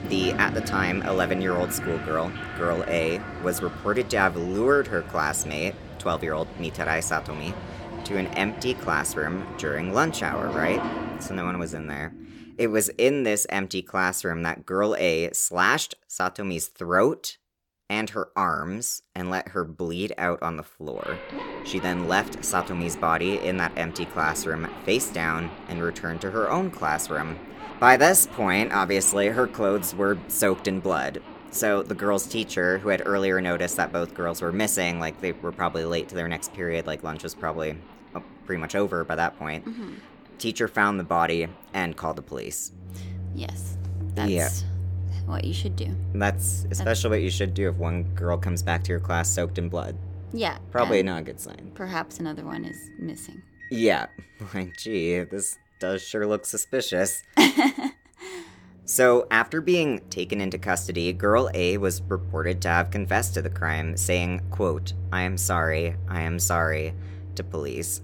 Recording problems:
household noises; loud; throughout; 9 dB below the speech

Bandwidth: 17 kHz